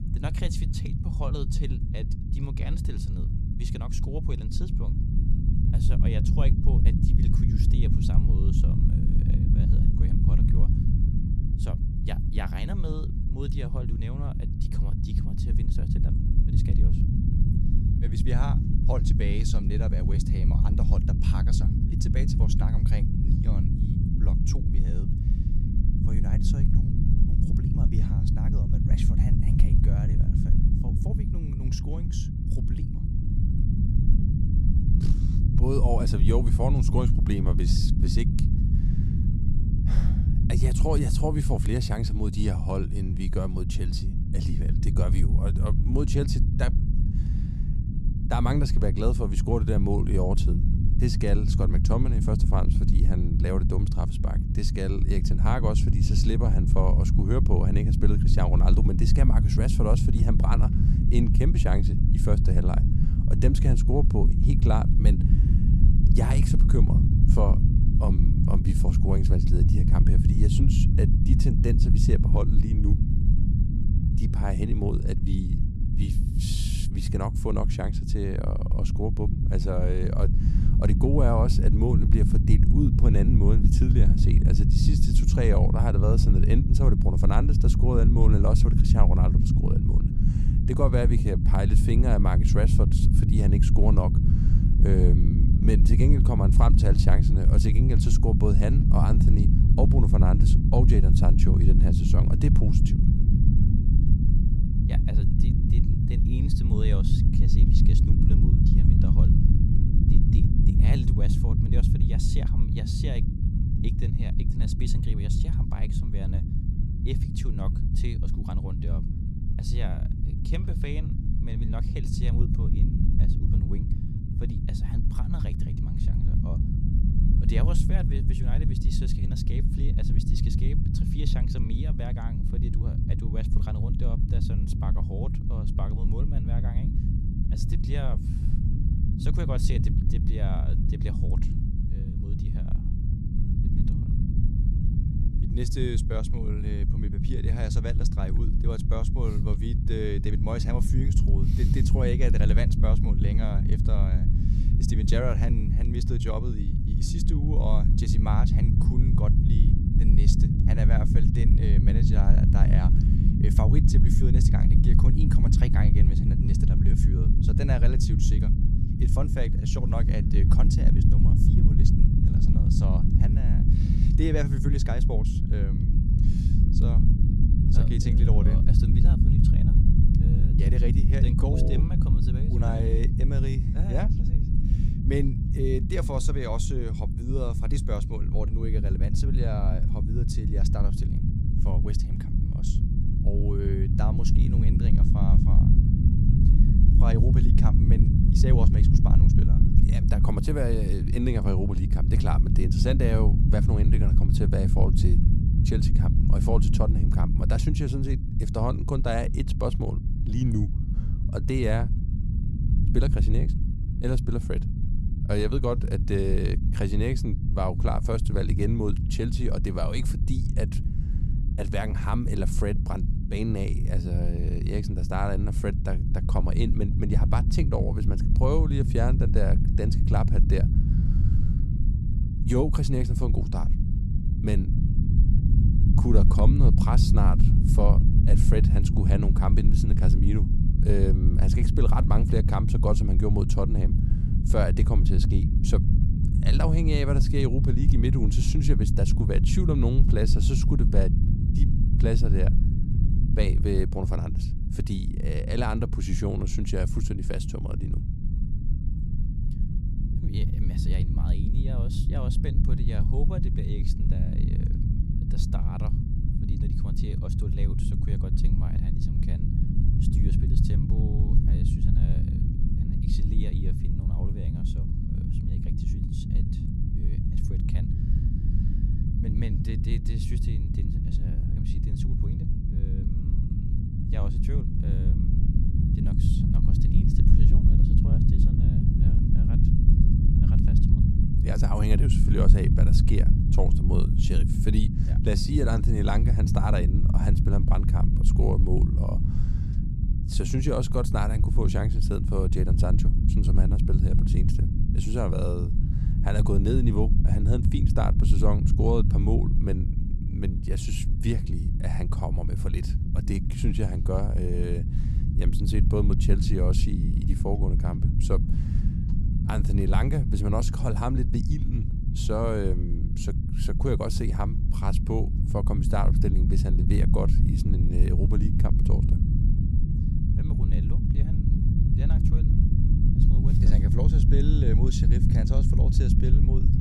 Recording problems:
low rumble; loud; throughout; 3 dB below the speech

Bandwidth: 15 kHz